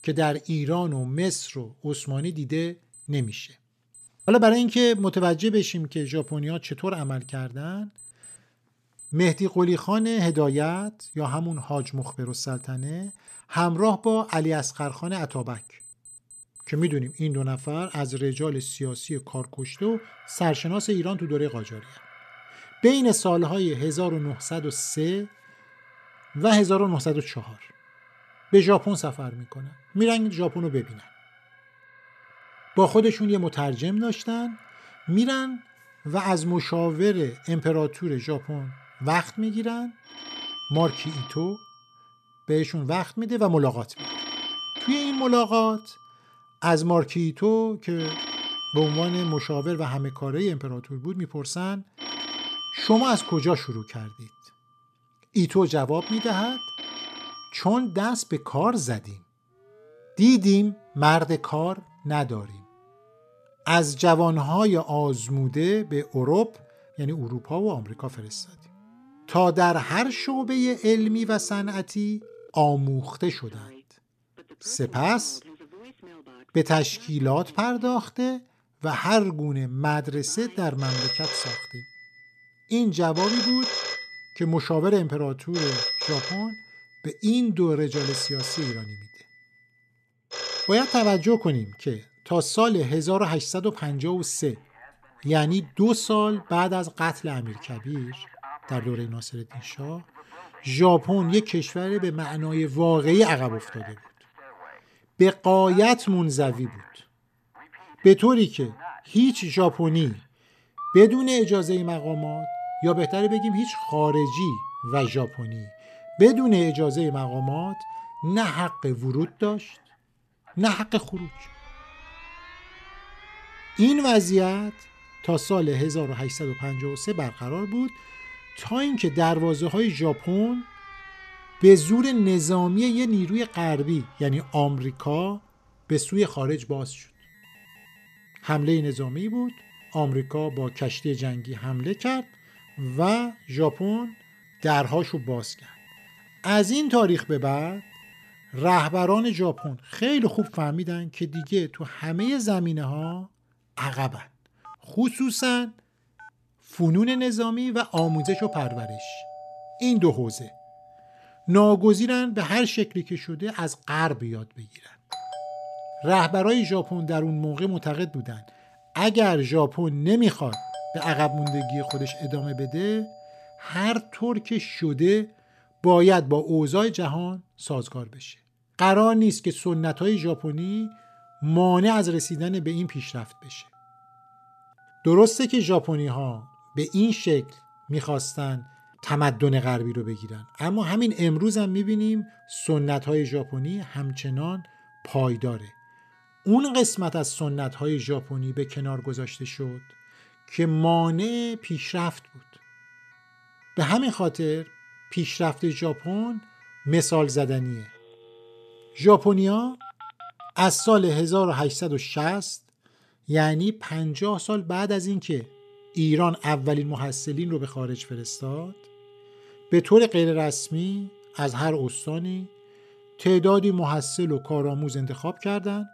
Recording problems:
alarms or sirens; noticeable; throughout; 15 dB below the speech

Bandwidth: 14 kHz